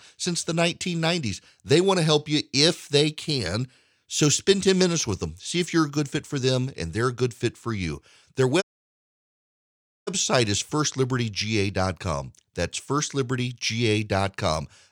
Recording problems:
audio cutting out; at 8.5 s for 1.5 s

